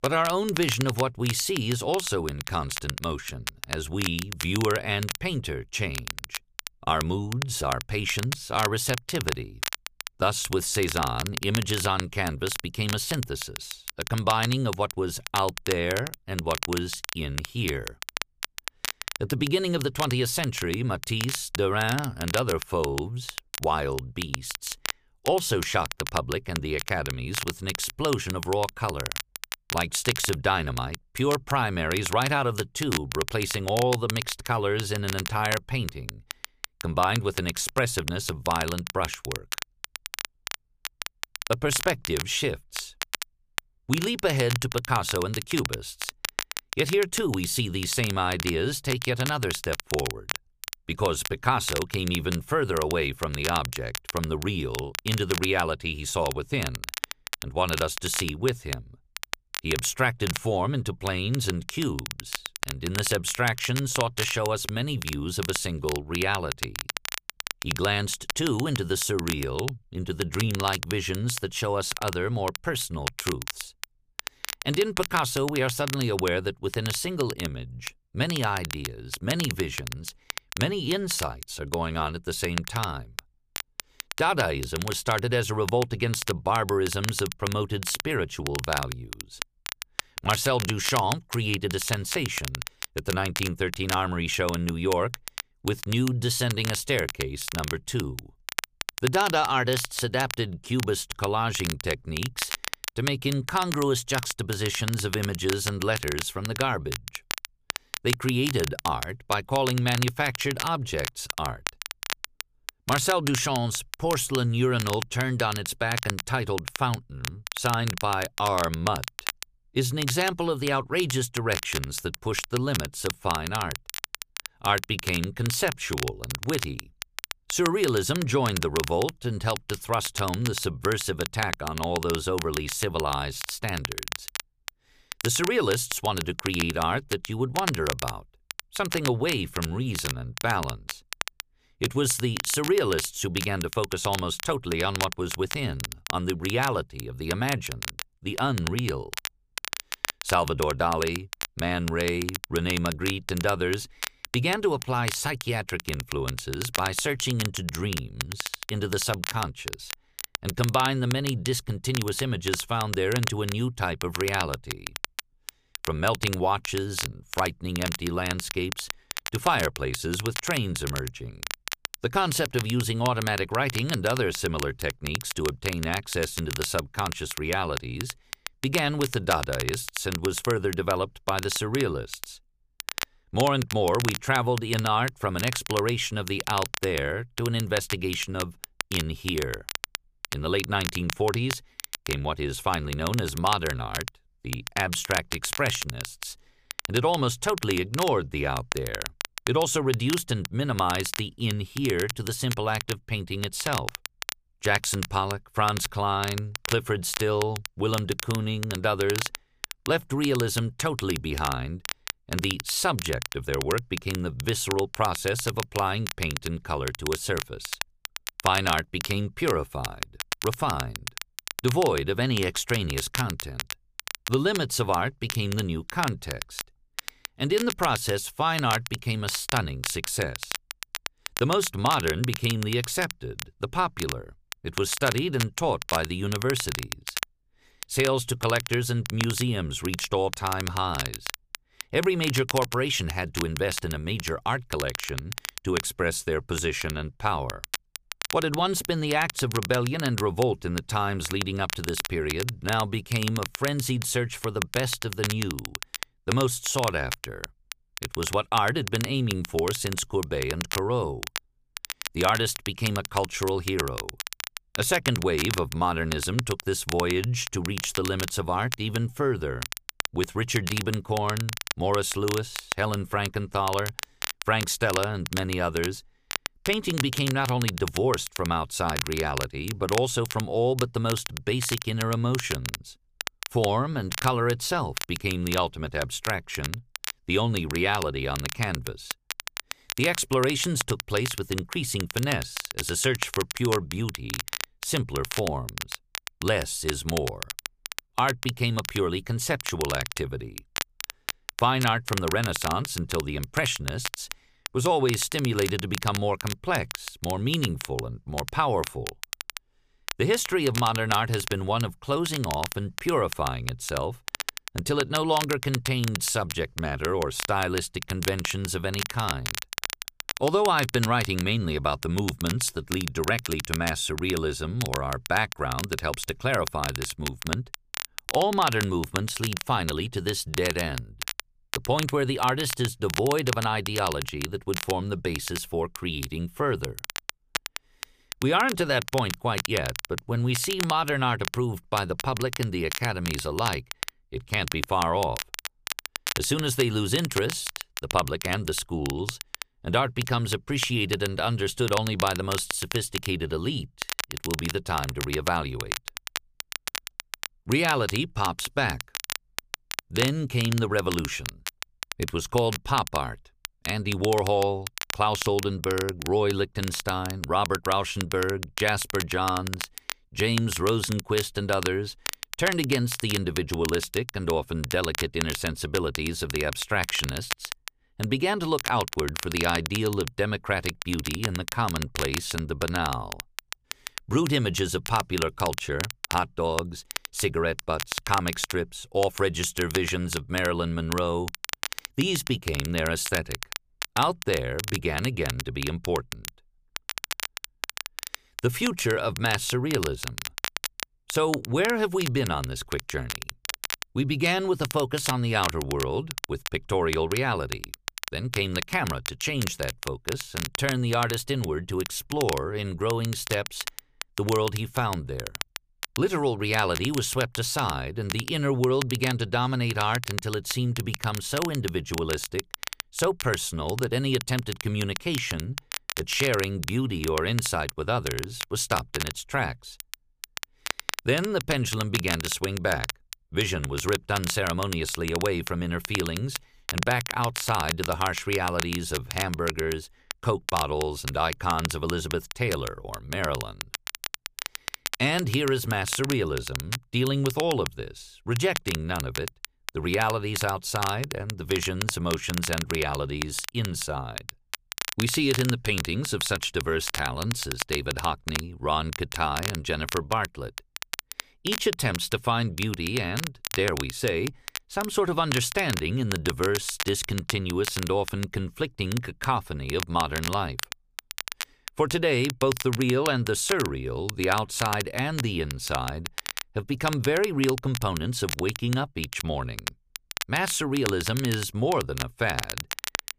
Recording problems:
crackle, like an old record; loud; 7 dB below the speech

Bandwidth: 15 kHz